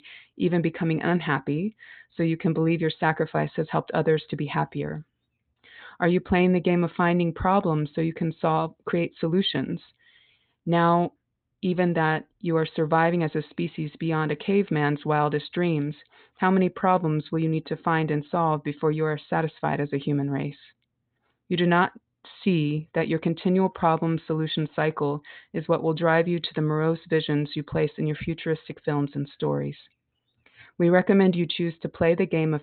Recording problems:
high frequencies cut off; severe; nothing above 4 kHz

